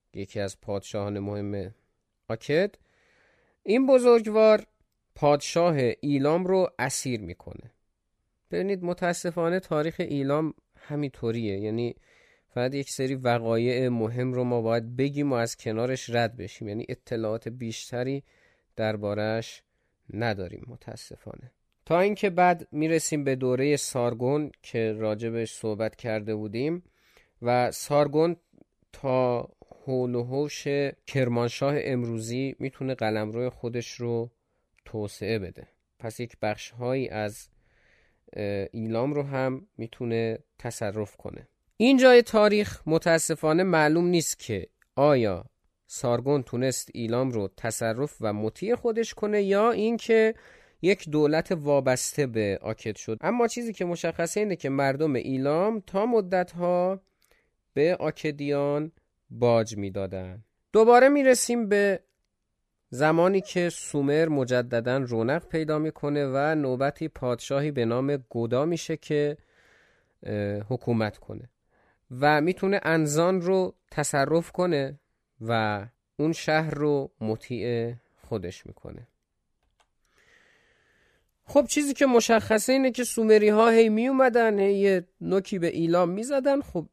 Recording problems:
none

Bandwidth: 14.5 kHz